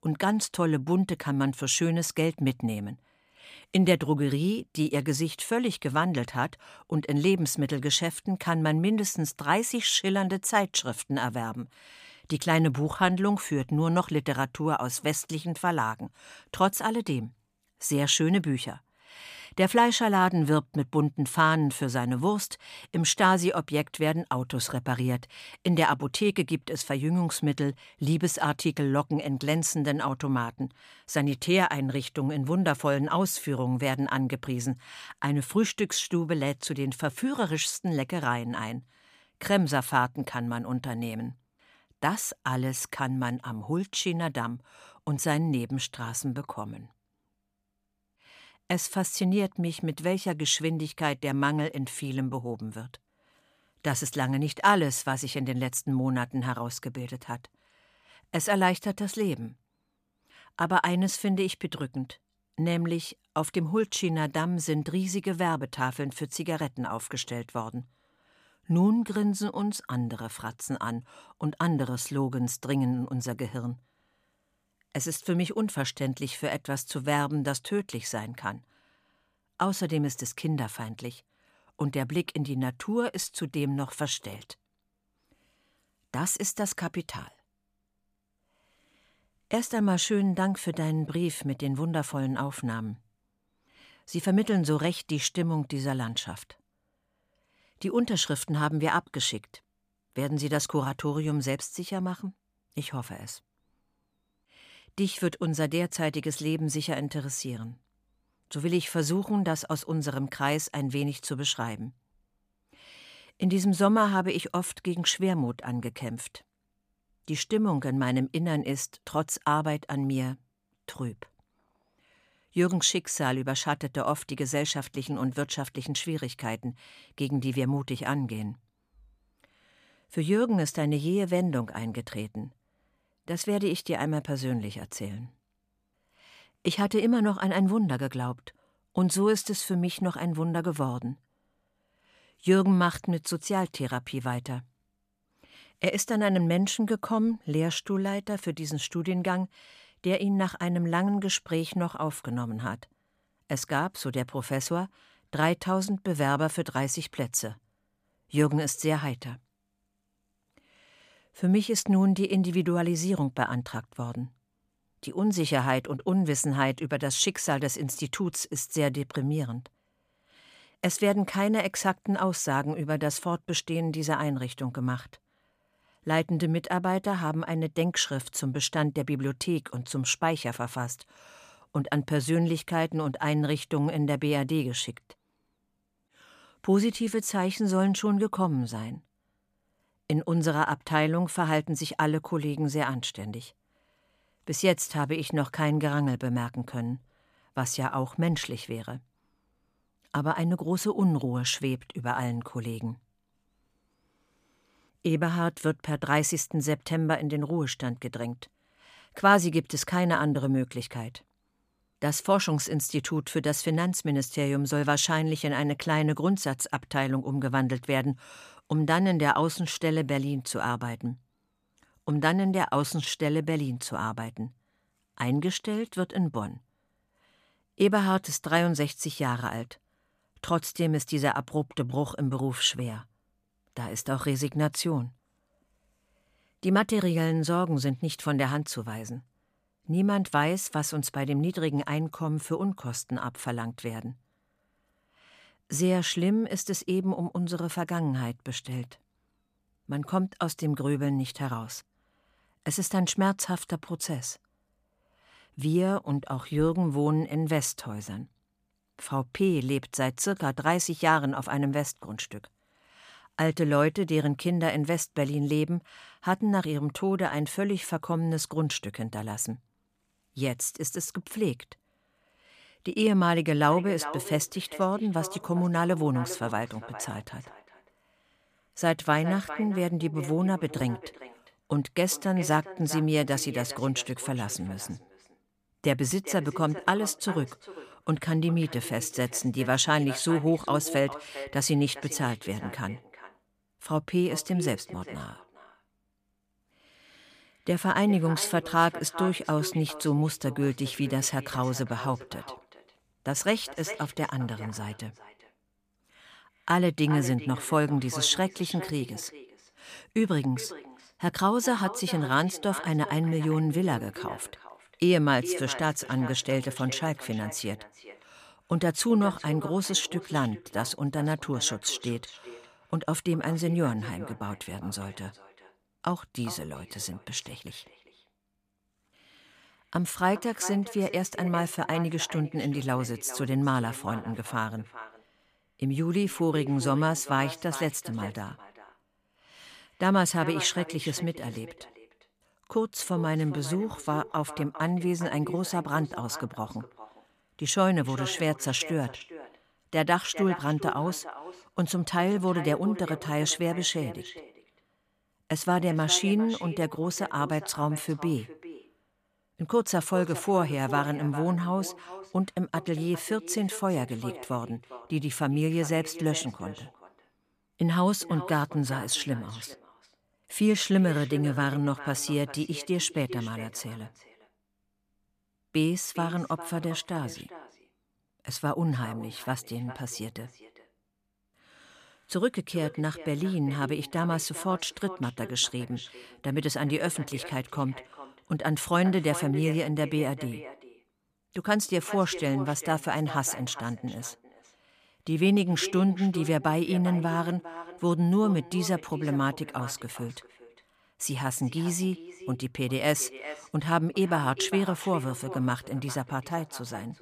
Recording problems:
echo of what is said; noticeable; from 4:34 on; 400 ms later, 15 dB below the speech

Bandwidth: 15 kHz